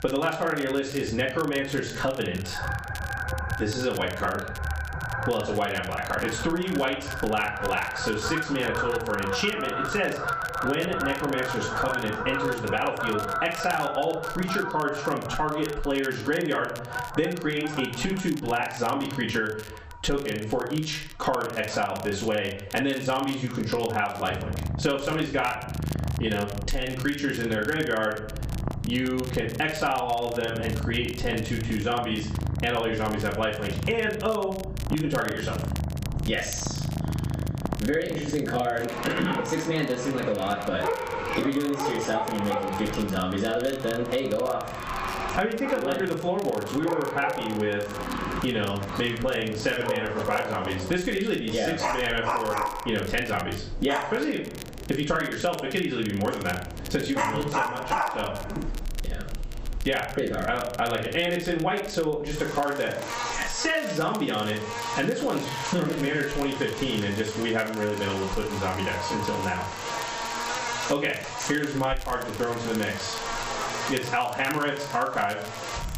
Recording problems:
off-mic speech; far
high frequencies cut off; noticeable; nothing above 8 kHz
room echo; slight; dies away in 0.4 s
squashed, flat; somewhat, background pumping
animal sounds; loud; throughout; 5 dB below the speech
crackle, like an old record; noticeable; 15 dB below the speech

